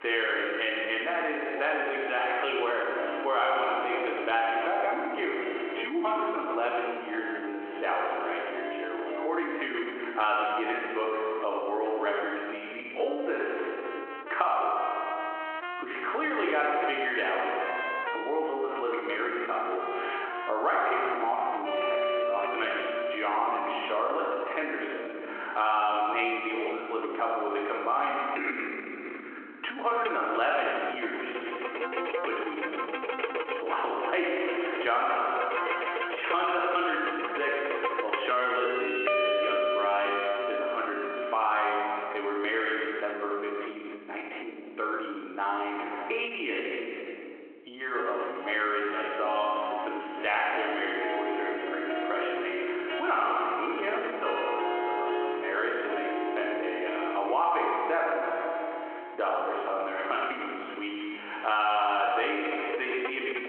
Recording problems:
off-mic speech; far
squashed, flat; heavily
room echo; noticeable; dies away in 1.3 s
phone-call audio
background music; loud; throughout; 5 dB below the speech

